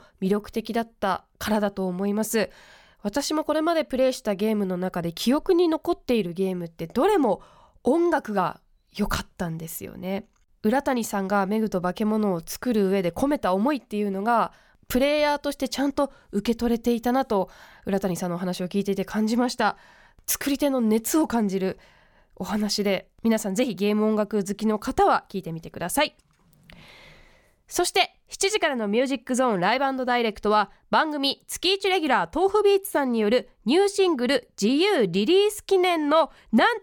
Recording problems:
none

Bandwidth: 18.5 kHz